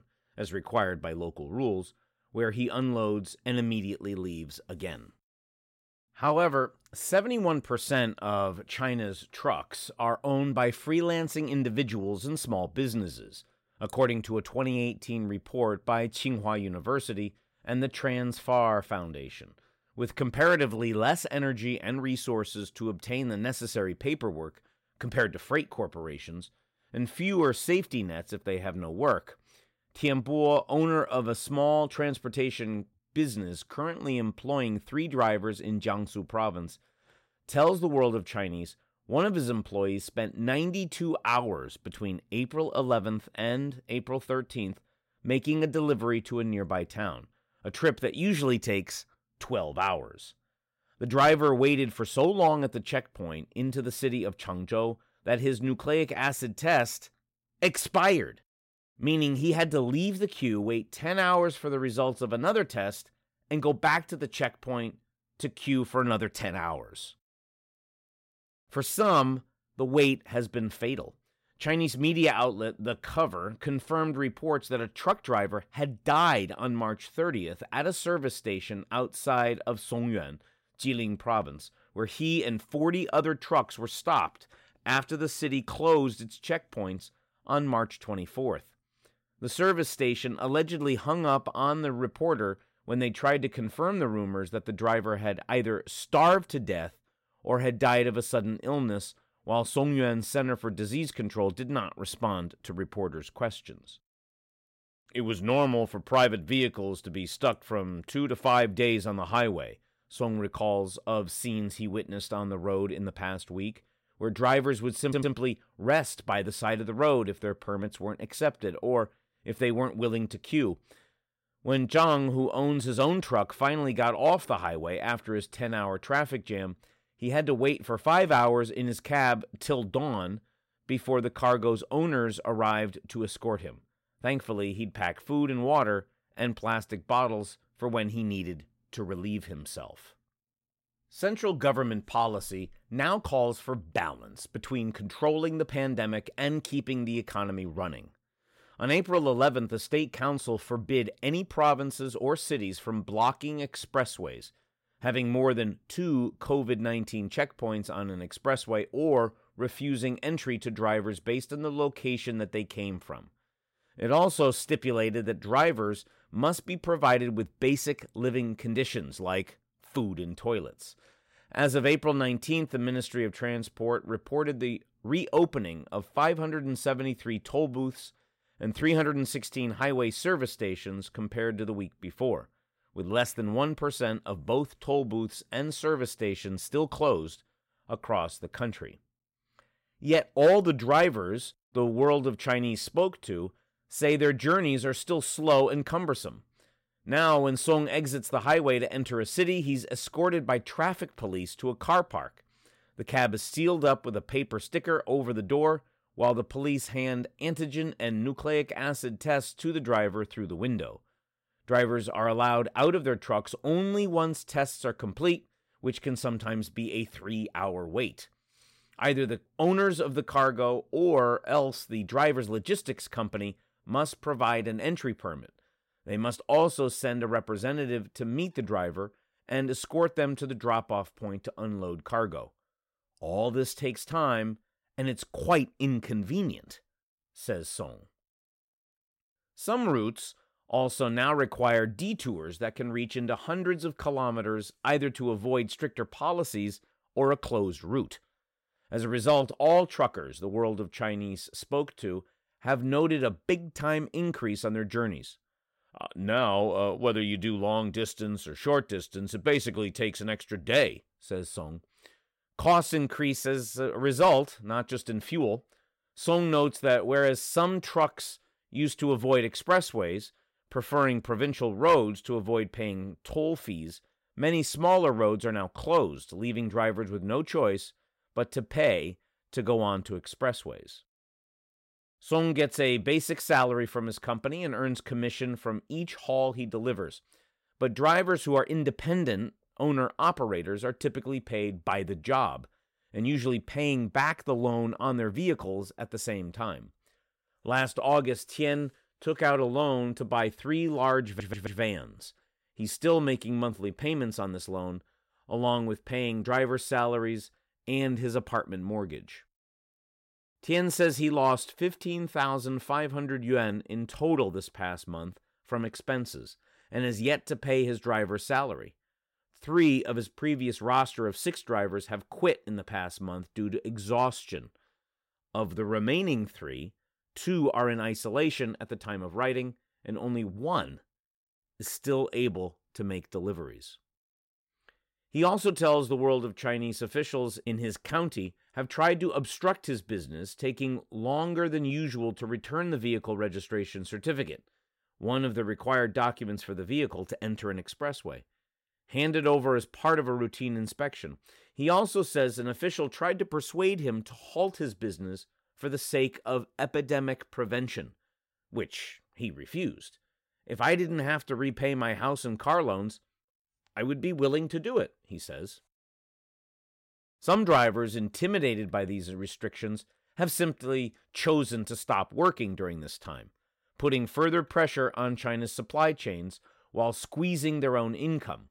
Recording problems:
audio stuttering; at 1:55 and at 5:01

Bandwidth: 16 kHz